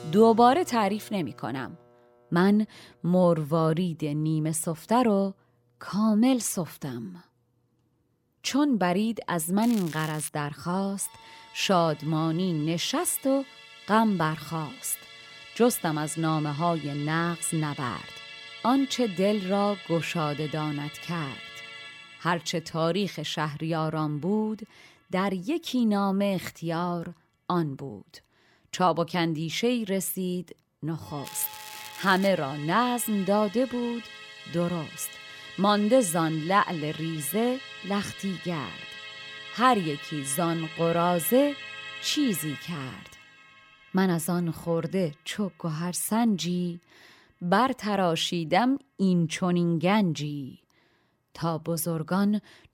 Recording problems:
background music; noticeable; throughout; 15 dB below the speech
crackling; noticeable; at 9.5 s and from 31 to 32 s; 15 dB below the speech

